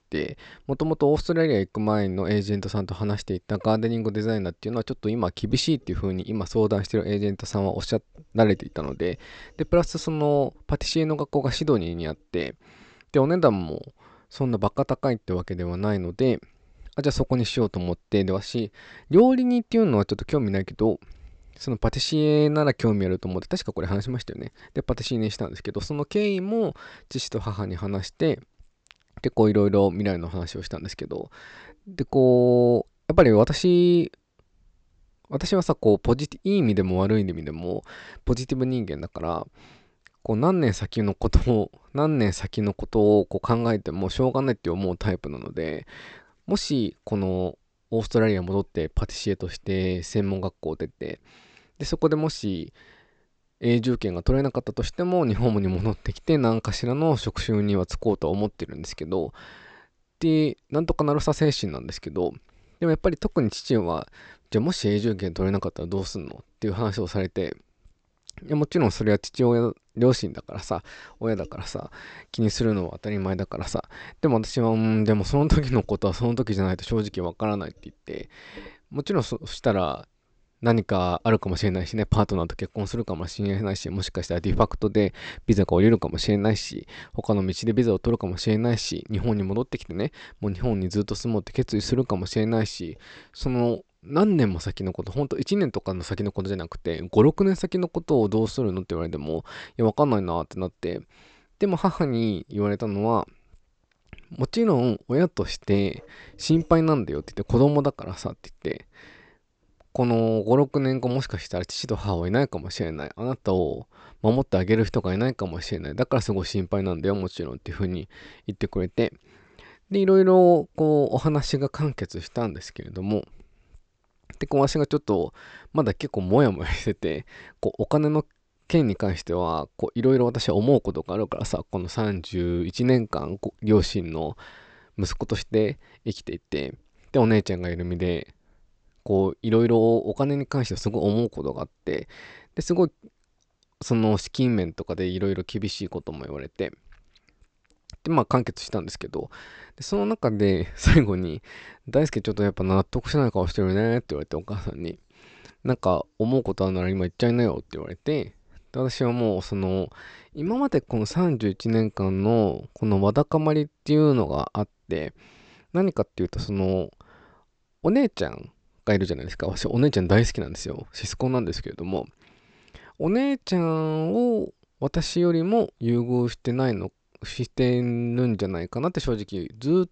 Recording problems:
high frequencies cut off; noticeable; nothing above 8 kHz

